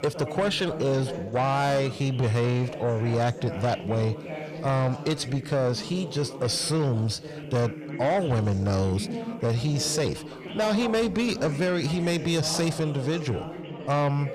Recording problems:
distortion; slight; 10 dB below the speech
background chatter; noticeable; throughout; 3 voices, 10 dB below the speech

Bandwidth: 14.5 kHz